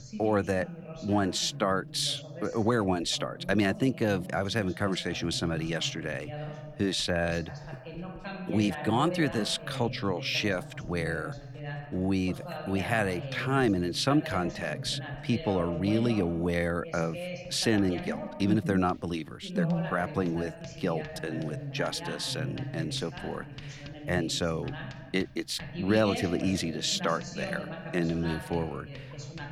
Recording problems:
voice in the background; loud; throughout; 10 dB below the speech
household noises; faint; throughout; 25 dB below the speech

